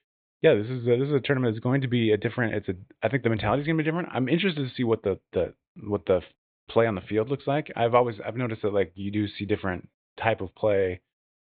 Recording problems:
high frequencies cut off; severe; nothing above 4 kHz

